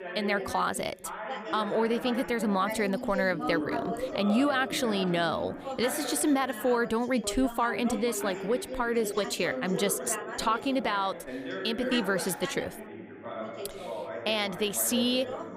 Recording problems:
background chatter; loud; throughout; 2 voices, 8 dB below the speech

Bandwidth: 15 kHz